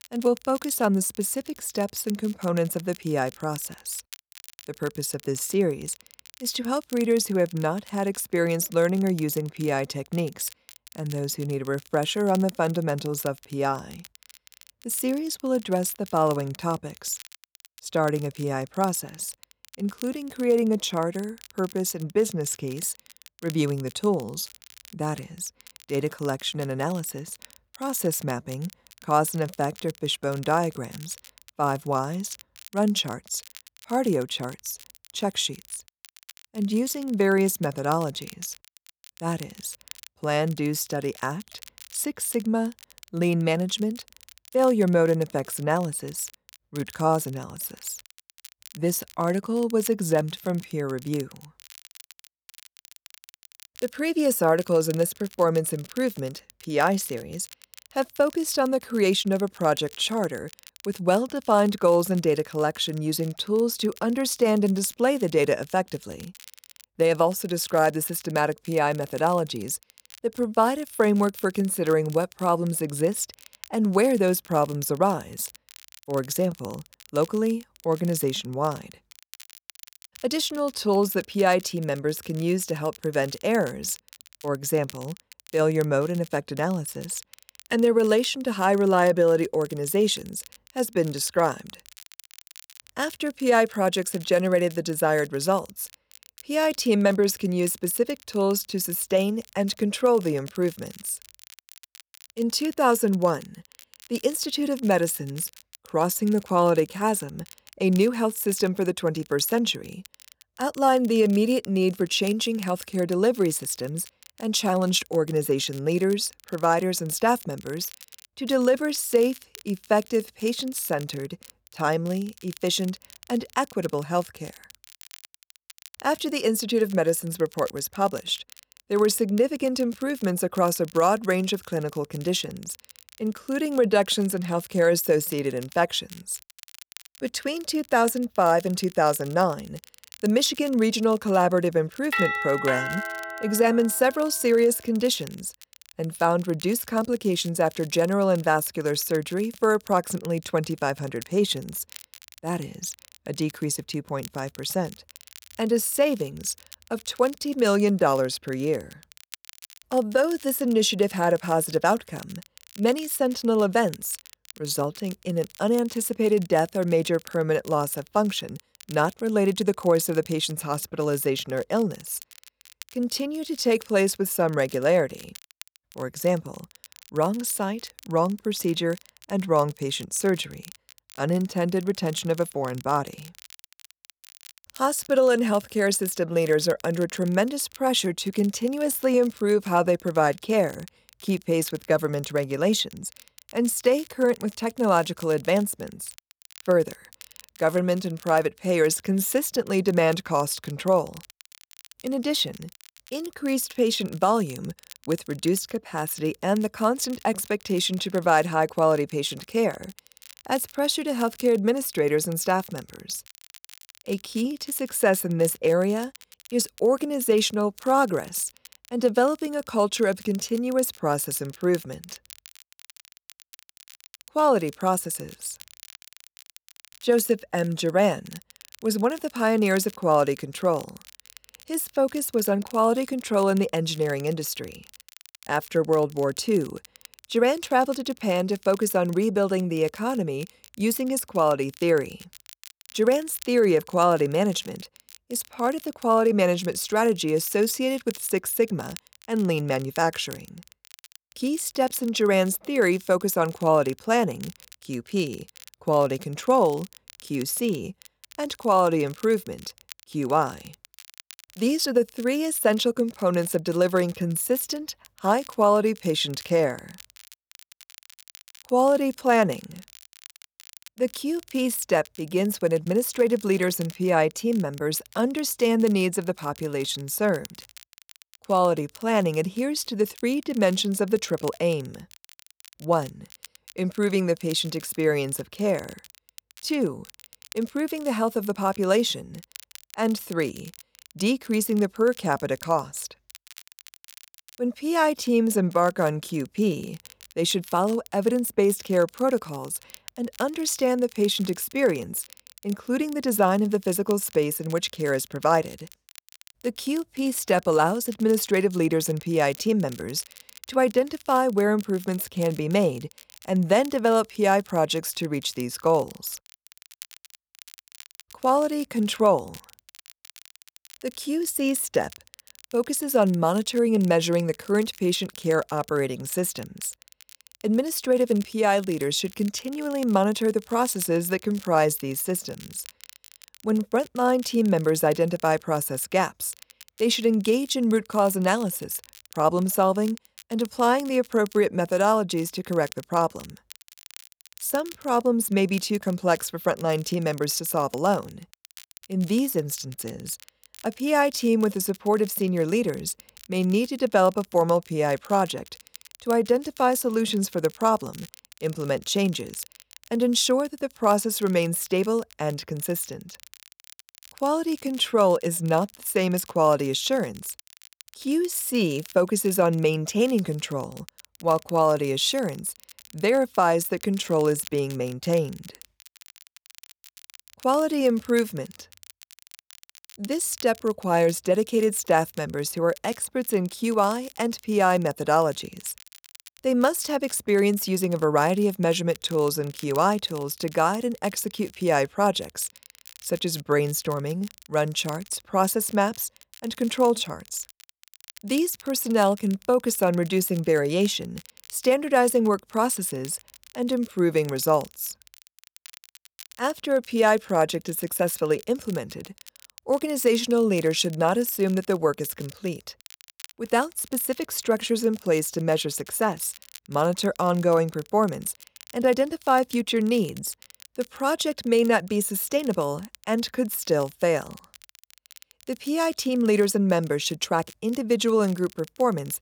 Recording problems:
crackle, like an old record; faint; 20 dB below the speech
doorbell; loud; from 2:22 to 2:24; peak level with the speech

